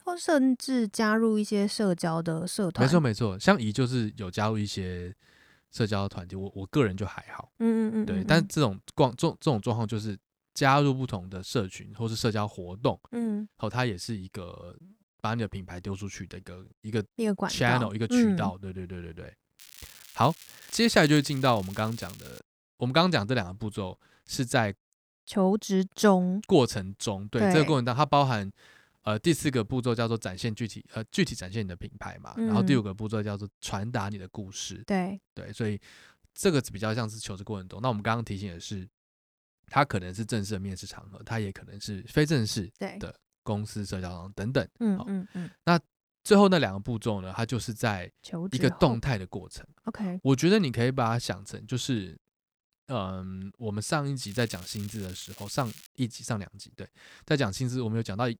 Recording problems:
crackling; noticeable; from 20 to 22 s and from 54 to 56 s; 20 dB below the speech

